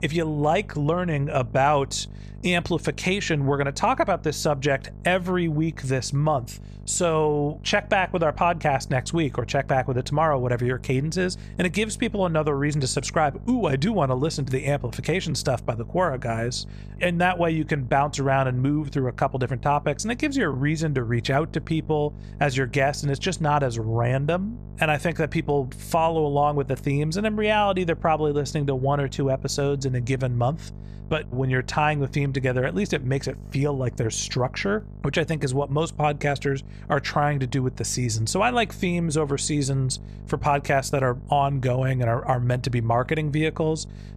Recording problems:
electrical hum; faint; throughout; 50 Hz, 25 dB below the speech

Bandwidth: 14.5 kHz